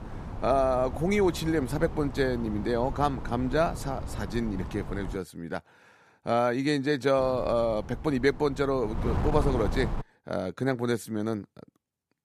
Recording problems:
wind noise on the microphone; occasional gusts; until 5 s and from 7 to 10 s; 15 dB below the speech

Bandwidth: 14.5 kHz